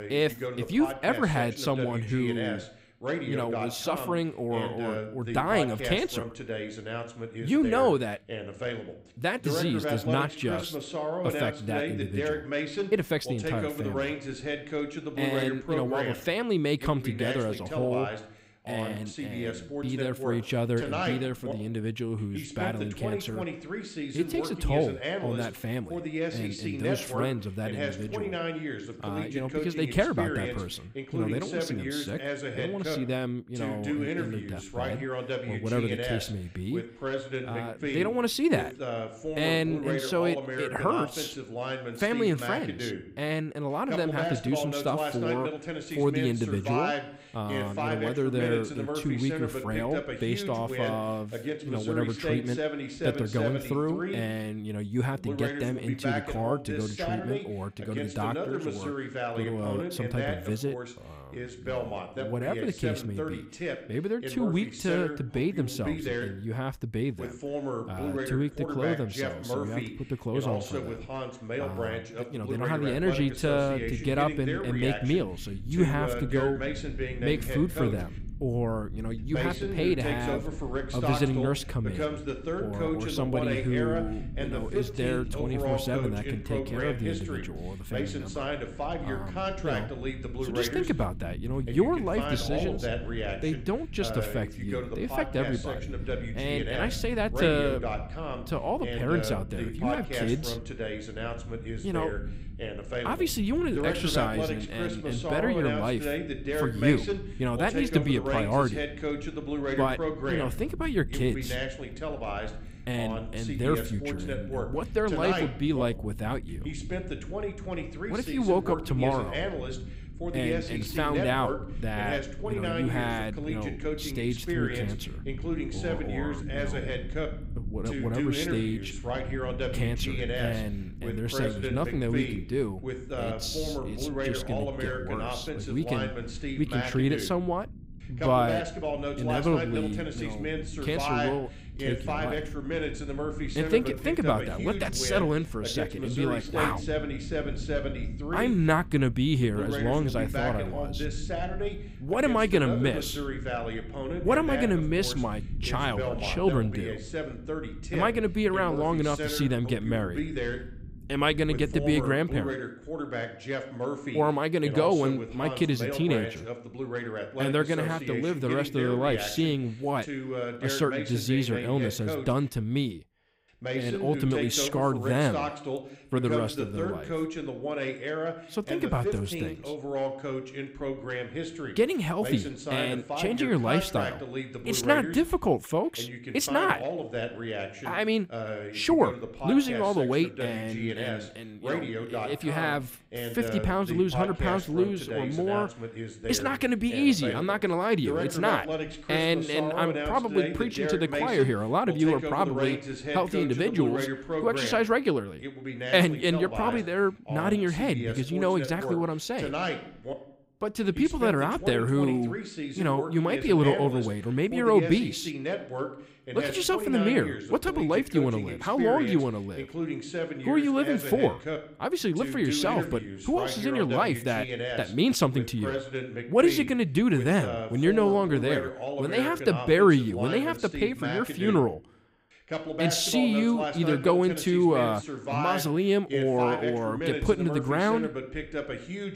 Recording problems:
voice in the background; loud; throughout; 5 dB below the speech
low rumble; faint; from 1:13 to 2:42; 25 dB below the speech

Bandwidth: 15.5 kHz